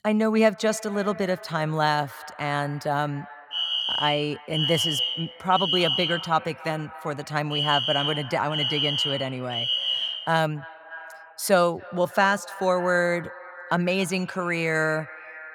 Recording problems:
echo of what is said; noticeable; throughout; 280 ms later, 15 dB below the speech
alarm; loud; from 3.5 to 10 s; peak 3 dB above the speech

